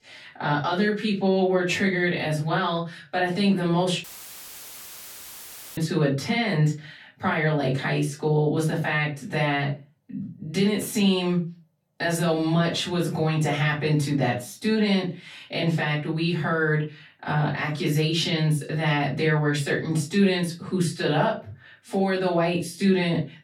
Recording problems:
off-mic speech; far
room echo; very slight; dies away in 0.2 s
audio cutting out; filled with static; at 4 s for 1.5 s

